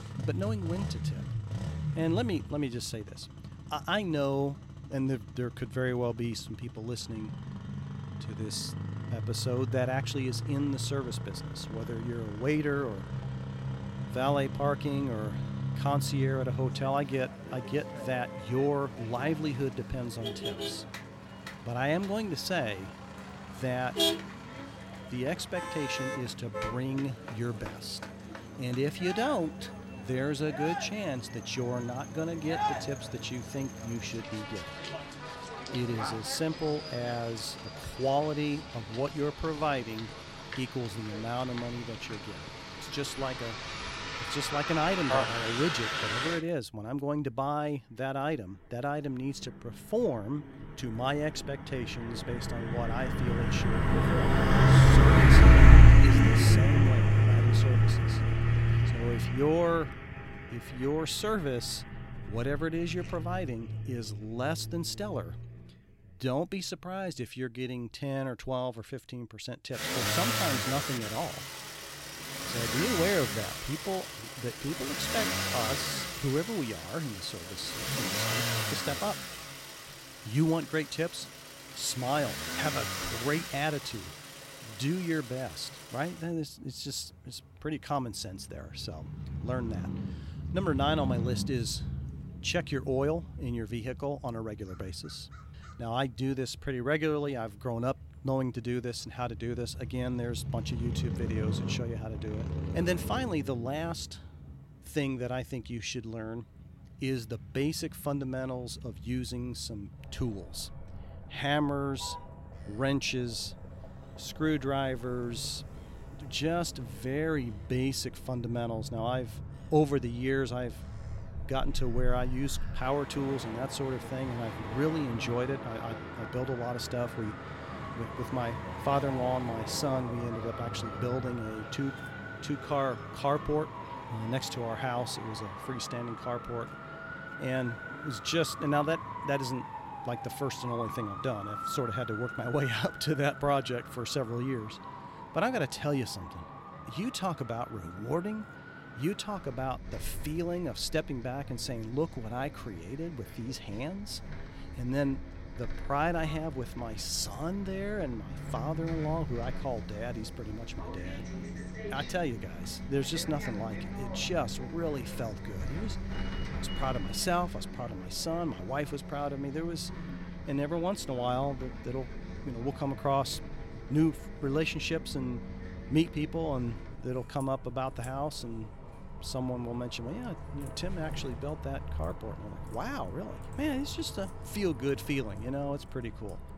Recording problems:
traffic noise; very loud; throughout; 1 dB above the speech

